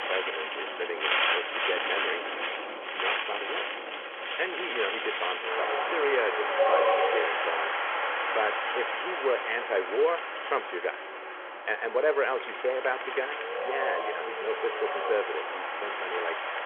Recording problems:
phone-call audio
wind in the background; very loud; throughout; 2 dB above the speech

